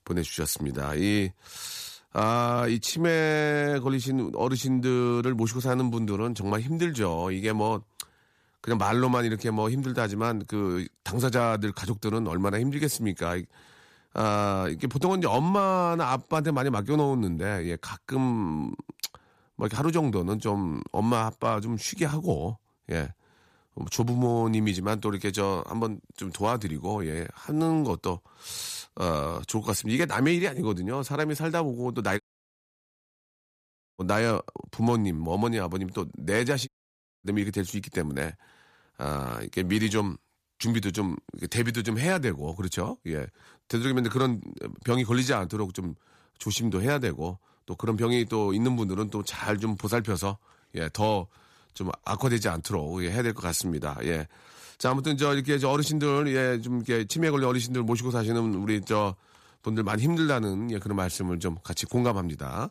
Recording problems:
audio cutting out; at 32 s for 2 s and at 37 s for 0.5 s

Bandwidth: 14.5 kHz